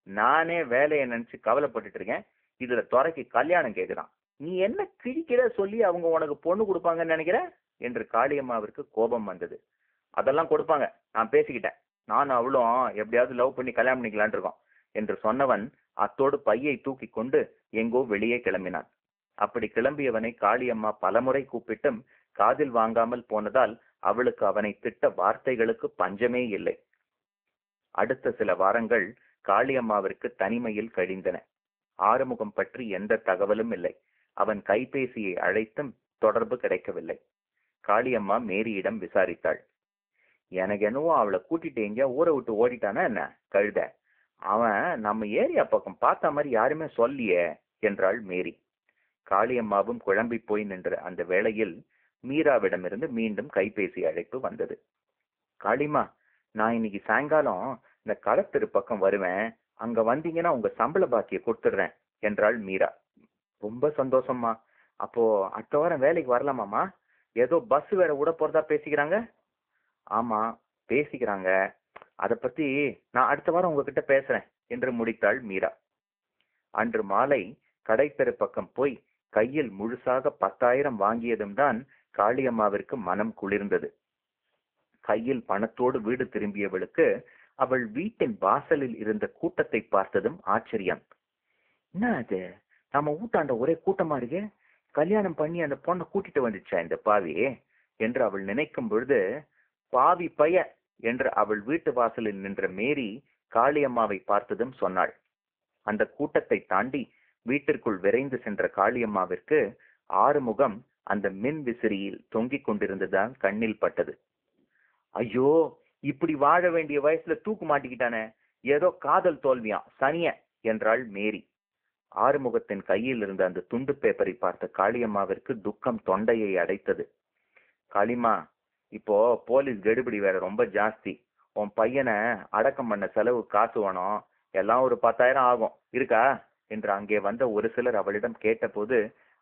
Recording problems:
phone-call audio; poor line
muffled; very slightly; fading above 3.5 kHz

